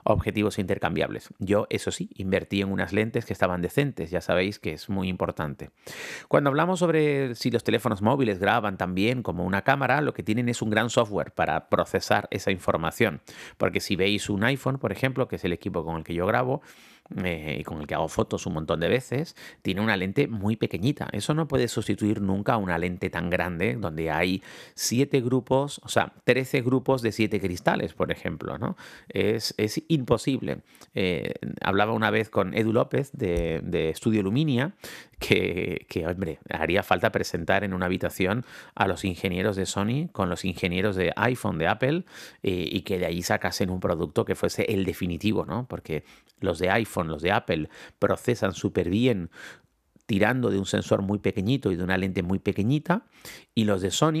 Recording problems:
abrupt cut into speech; at the end

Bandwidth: 14.5 kHz